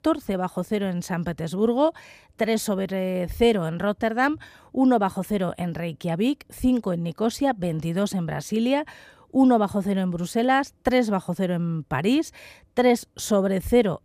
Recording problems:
none

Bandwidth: 15 kHz